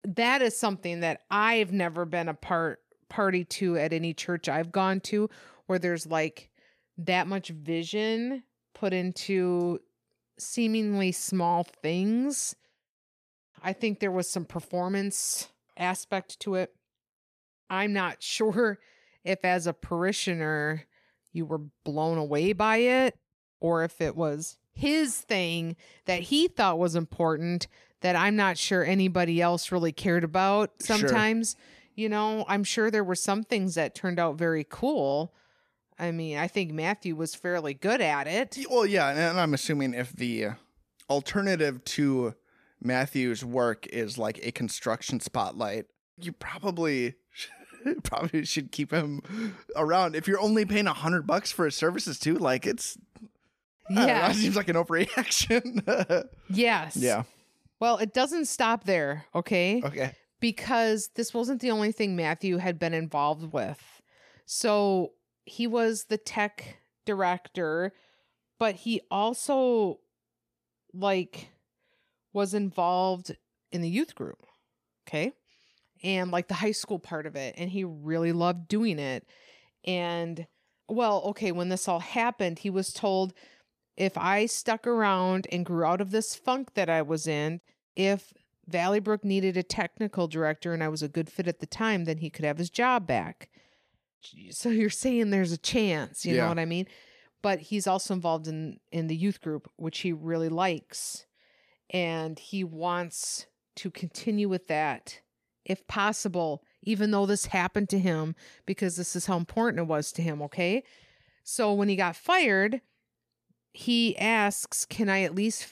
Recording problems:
none

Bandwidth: 14.5 kHz